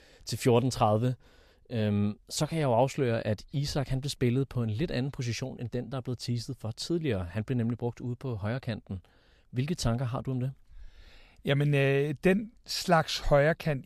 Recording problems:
none

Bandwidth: 15 kHz